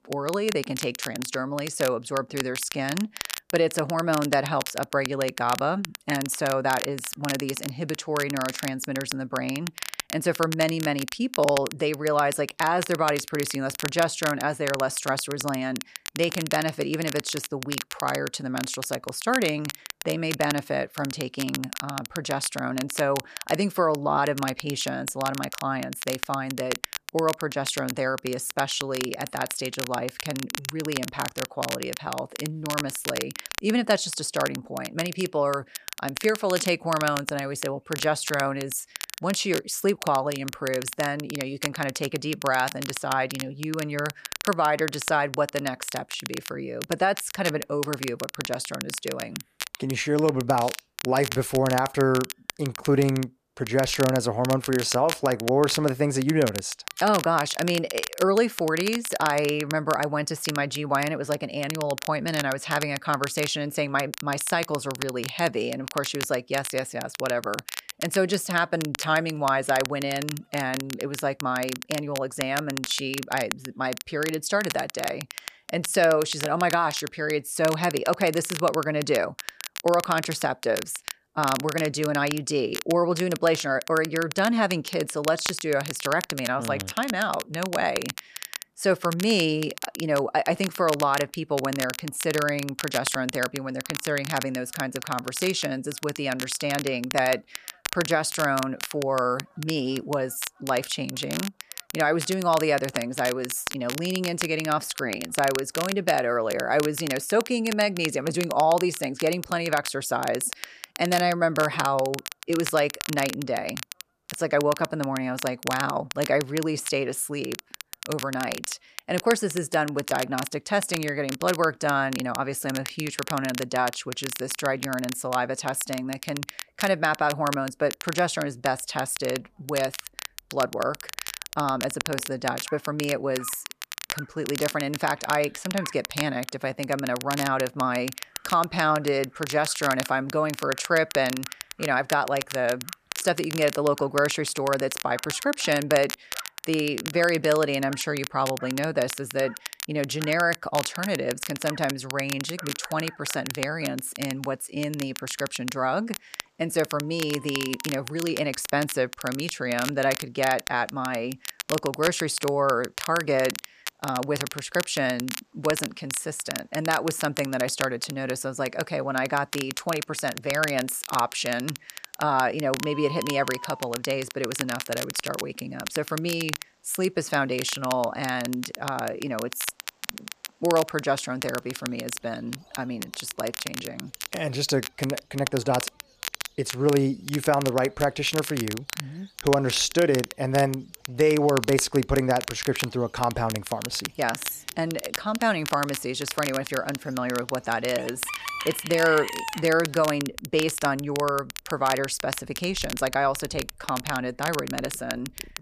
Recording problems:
crackle, like an old record; loud; 9 dB below the speech
animal sounds; noticeable; throughout; 20 dB below the speech

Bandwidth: 14.5 kHz